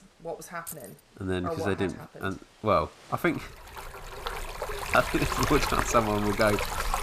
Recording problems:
rain or running water; loud; throughout; 3 dB below the speech
jangling keys; faint; at 0.5 s; peak 10 dB below the speech
door banging; faint; at 4 s; peak 15 dB below the speech

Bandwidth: 14.5 kHz